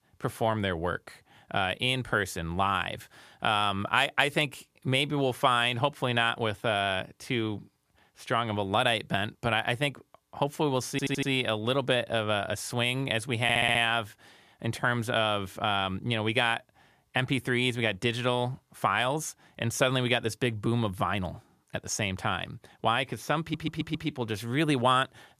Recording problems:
audio stuttering; at 11 s, at 13 s and at 23 s

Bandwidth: 14.5 kHz